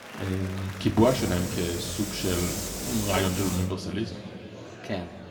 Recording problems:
room echo; slight; dies away in 1.7 s
off-mic speech; somewhat distant
murmuring crowd; noticeable; throughout; 15 dB below the speech
hiss; very faint; from 1 to 3.5 s; 5 dB below the speech

